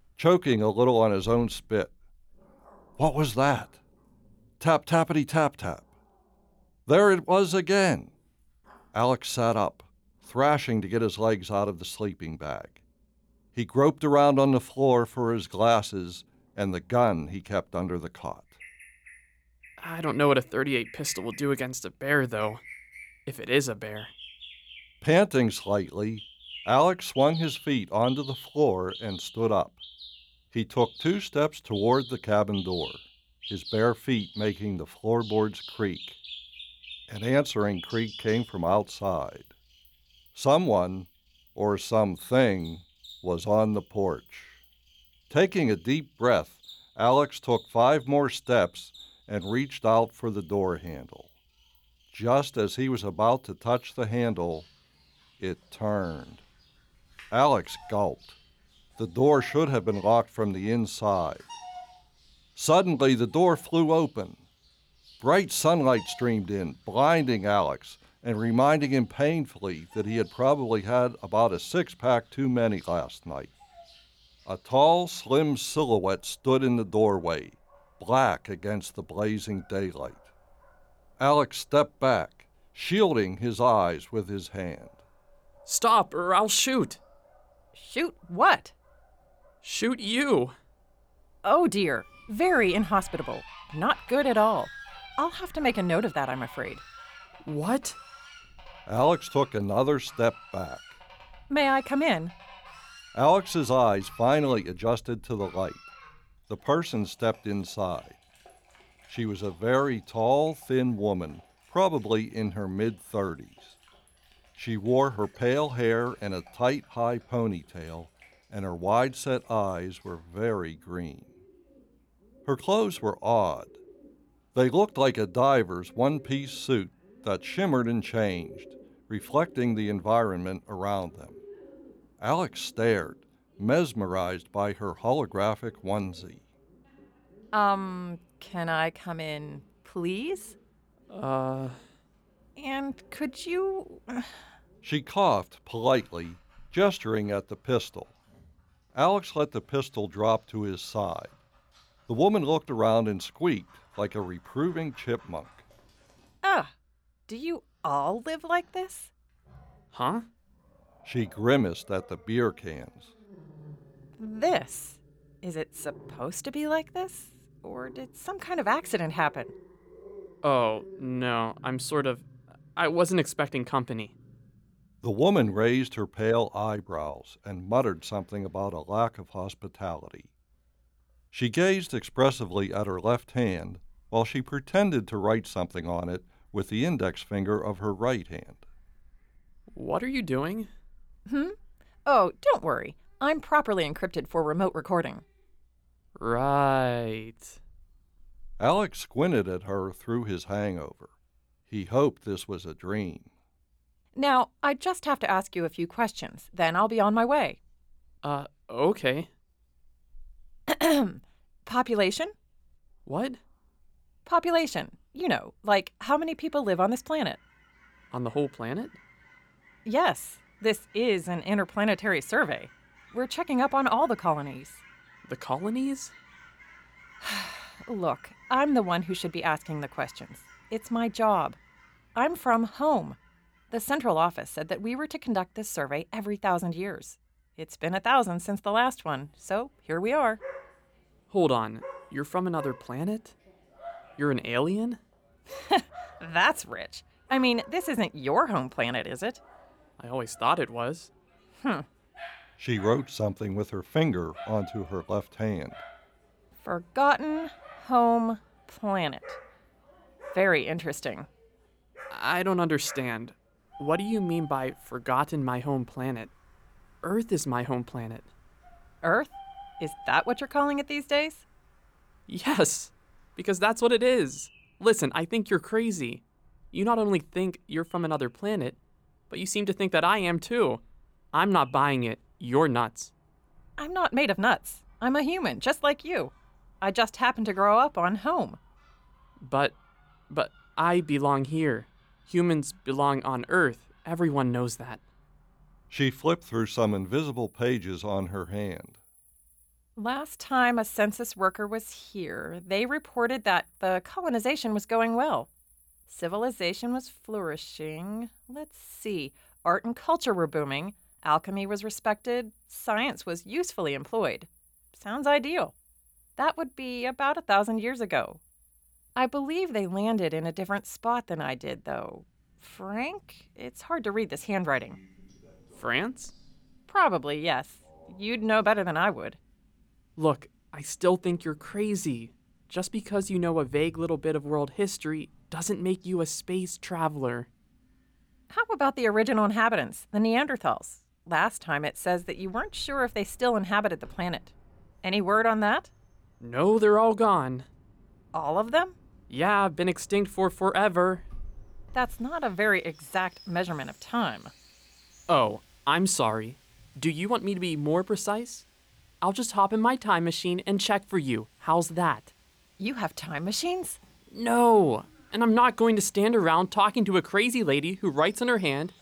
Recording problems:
animal sounds; faint; throughout; 25 dB below the speech

